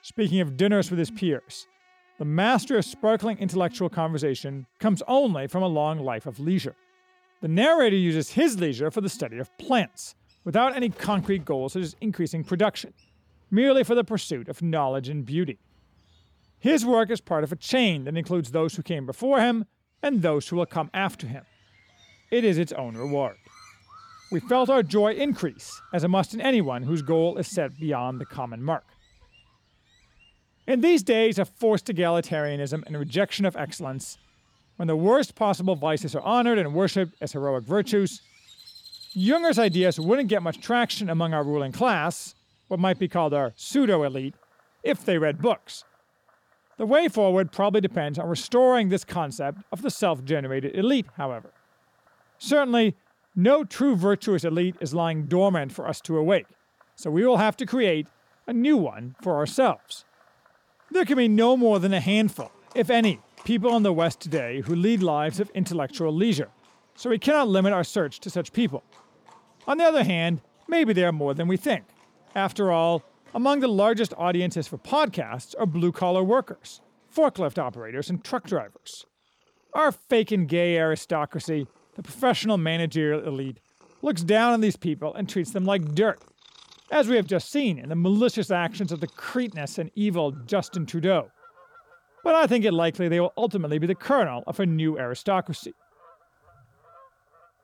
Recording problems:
animal sounds; faint; throughout; 30 dB below the speech

